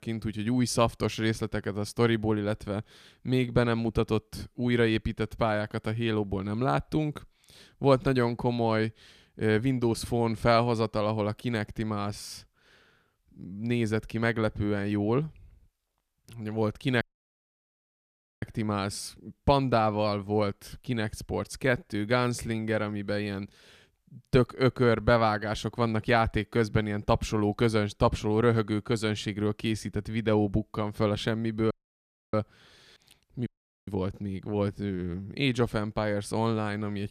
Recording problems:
audio cutting out; at 17 s for 1.5 s, at 32 s for 0.5 s and at 33 s

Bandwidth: 14.5 kHz